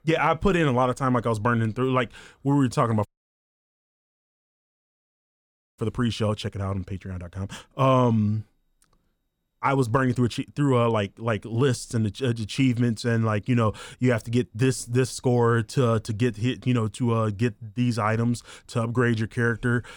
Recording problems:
audio cutting out; at 3 s for 2.5 s

